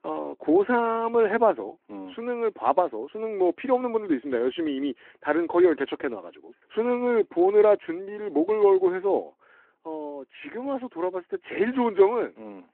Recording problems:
phone-call audio

